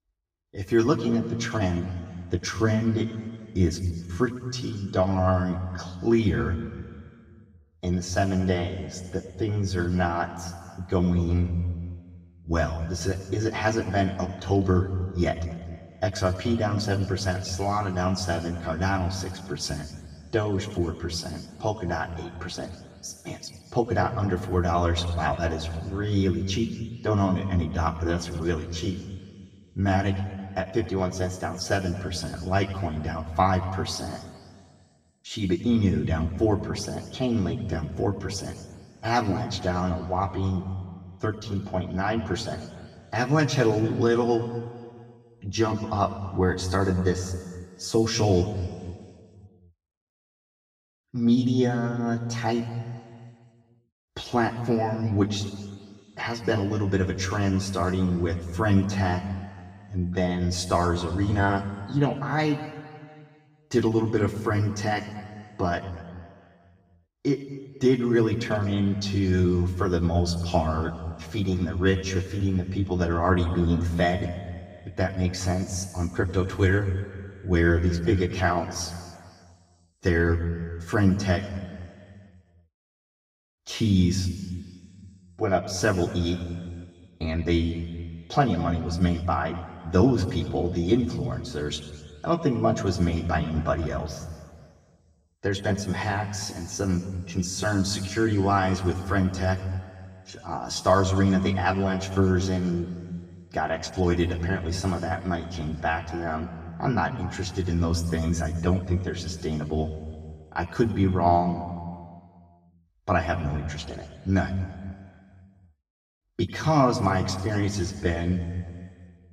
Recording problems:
off-mic speech; far
room echo; noticeable; dies away in 1.6 s

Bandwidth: 15.5 kHz